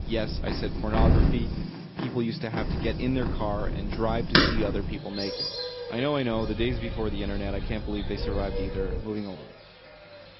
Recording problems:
high frequencies cut off; noticeable; nothing above 5.5 kHz
garbled, watery; slightly
animal sounds; very loud; throughout; as loud as the speech
wind noise on the microphone; occasional gusts; until 1.5 s, from 2.5 to 5 s and from 6.5 to 9 s; 10 dB below the speech

